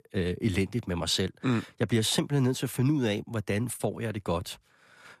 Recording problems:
none

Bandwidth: 14.5 kHz